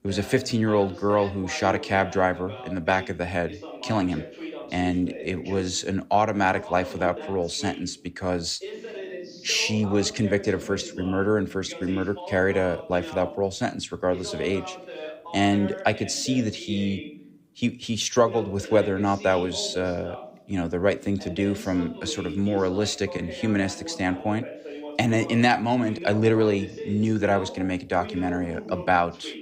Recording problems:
voice in the background; noticeable; throughout; 15 dB below the speech

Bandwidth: 15.5 kHz